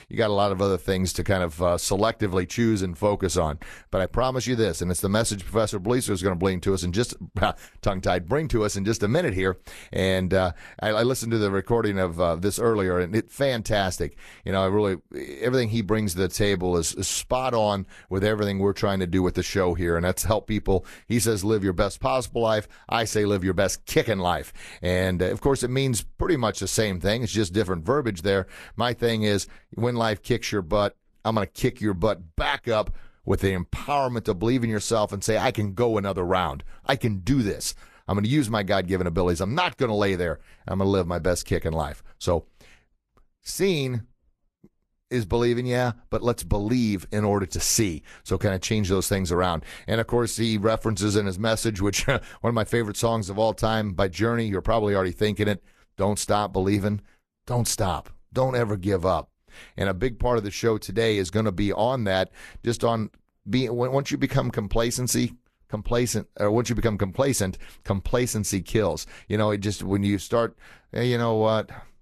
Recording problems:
garbled, watery; slightly; nothing above 12.5 kHz

